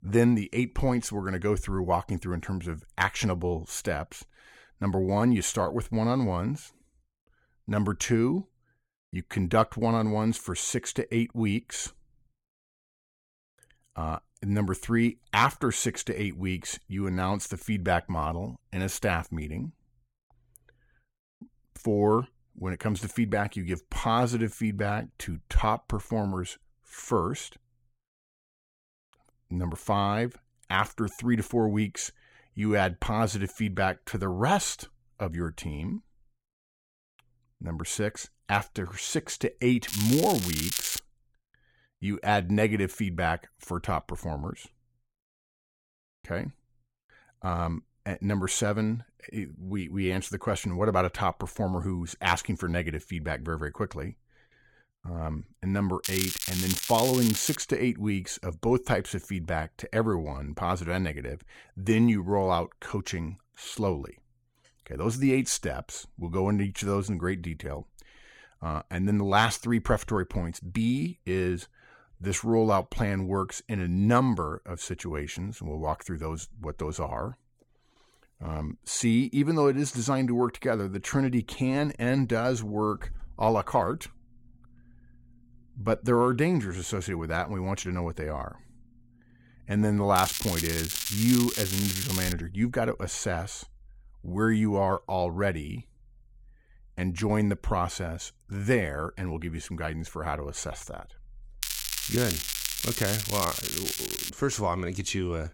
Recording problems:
crackling; loud; 4 times, first at 40 s; 2 dB below the speech

